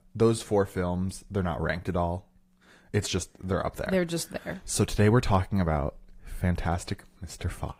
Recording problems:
garbled, watery; slightly; nothing above 15.5 kHz

